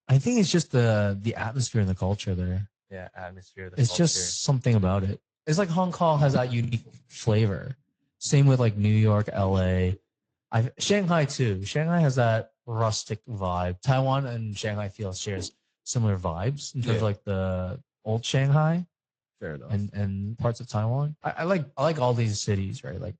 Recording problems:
garbled, watery; slightly; nothing above 8 kHz
choppy; occasionally; at 6.5 s; 3% of the speech affected

